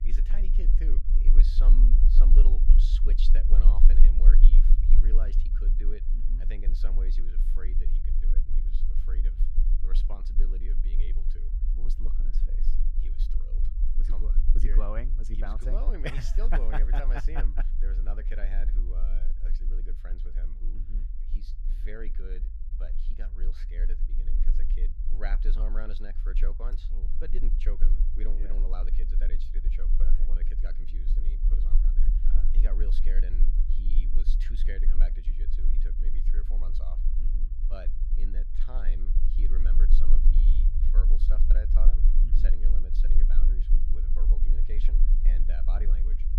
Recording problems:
low rumble; loud; throughout; 7 dB below the speech

